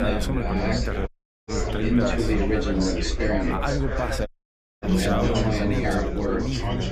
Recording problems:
chatter from many people; very loud; throughout; 5 dB above the speech
high-pitched whine; faint; throughout; 2 kHz, 25 dB below the speech
low rumble; faint; throughout; 25 dB below the speech
abrupt cut into speech; at the start
audio cutting out; at 1 s and at 4.5 s for 0.5 s

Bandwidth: 15 kHz